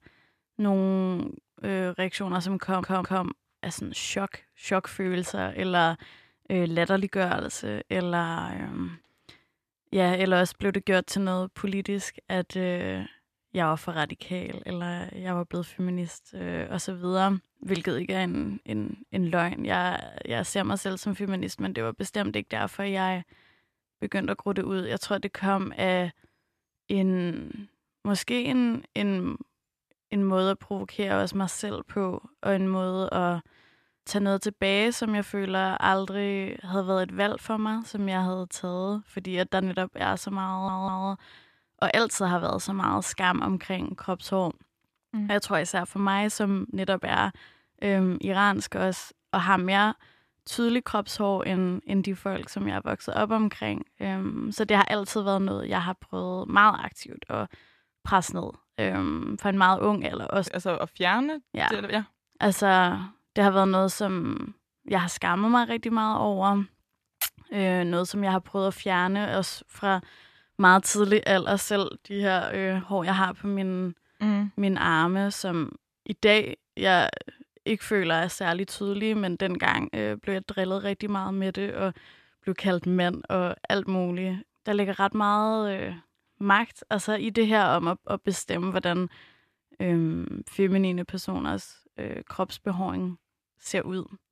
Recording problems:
audio stuttering; at 2.5 s and at 40 s

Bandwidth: 14 kHz